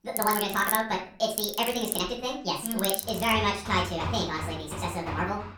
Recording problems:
off-mic speech; far
wrong speed and pitch; too fast and too high; 1.6 times normal speed
room echo; slight; dies away in 0.4 s
machinery noise; loud; throughout; 5 dB below the speech

